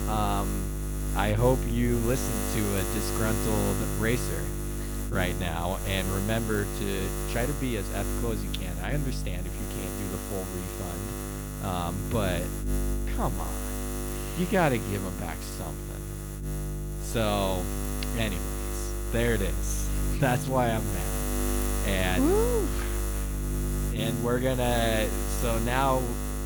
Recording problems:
electrical hum; loud; throughout; 50 Hz, 6 dB below the speech

